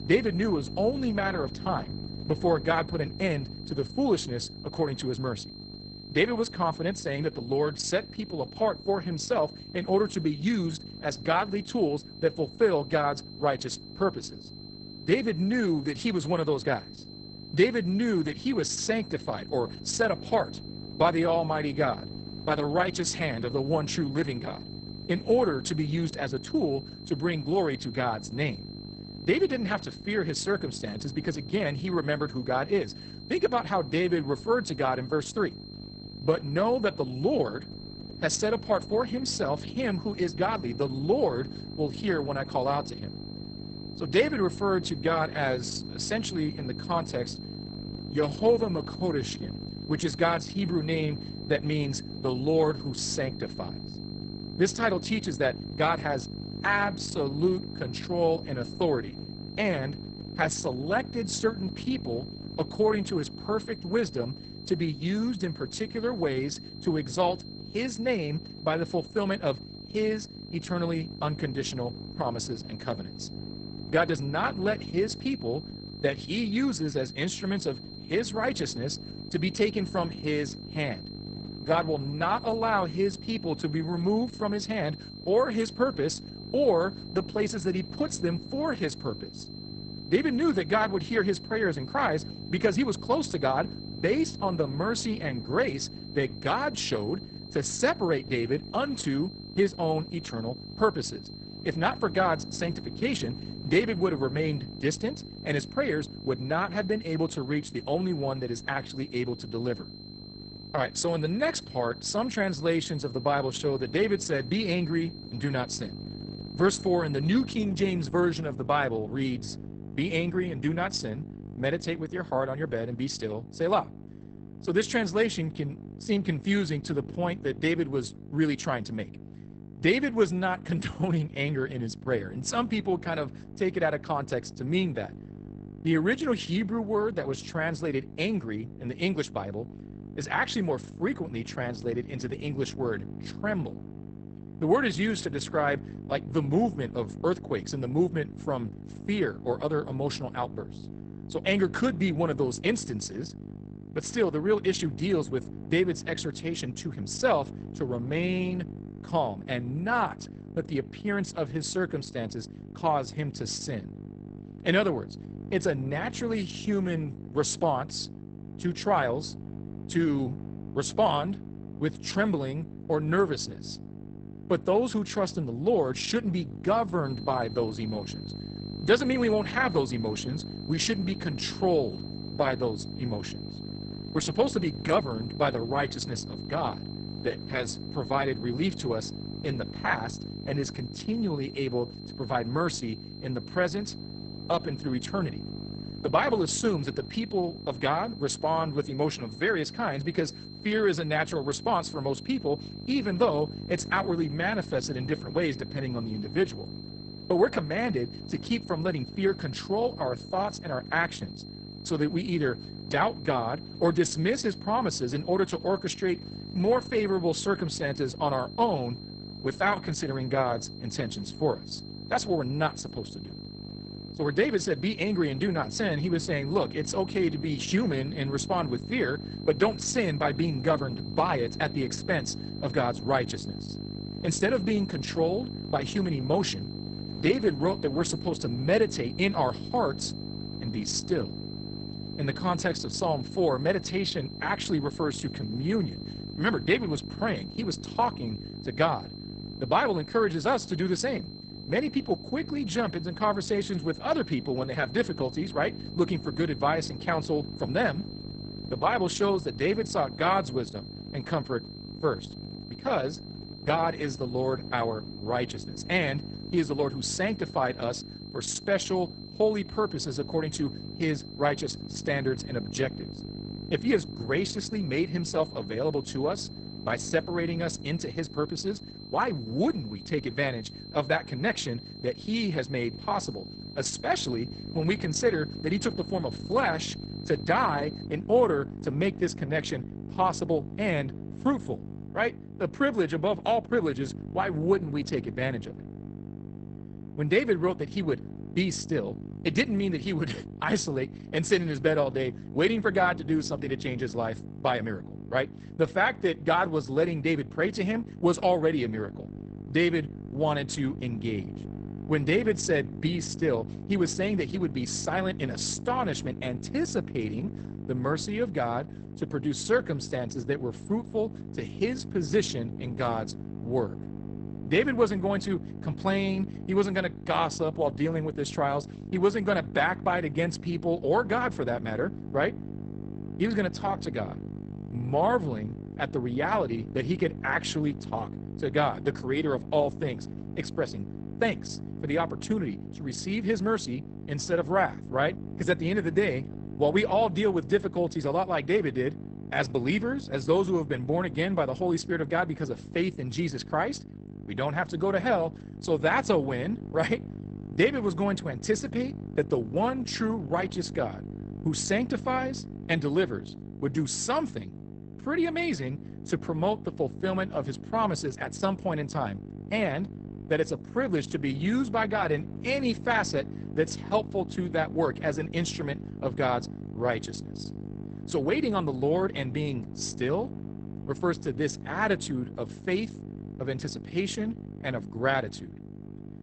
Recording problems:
garbled, watery; badly; nothing above 8 kHz
electrical hum; noticeable; throughout; 50 Hz, 20 dB below the speech
high-pitched whine; noticeable; until 1:58 and from 2:57 to 4:48; 4 kHz, 15 dB below the speech

